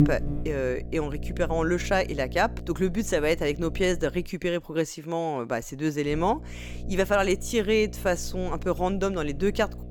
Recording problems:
electrical hum; noticeable; until 4.5 s and from 6 s on; 60 Hz, 20 dB below the speech

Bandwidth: 18.5 kHz